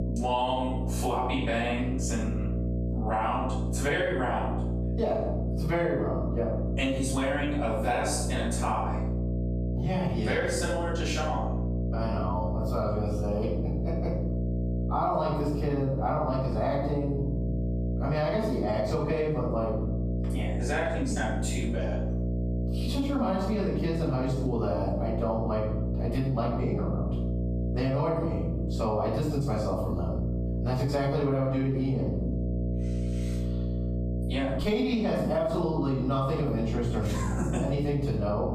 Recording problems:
off-mic speech; far
room echo; noticeable; dies away in 0.7 s
squashed, flat; somewhat
electrical hum; noticeable; throughout; 60 Hz, 10 dB below the speech

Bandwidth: 14.5 kHz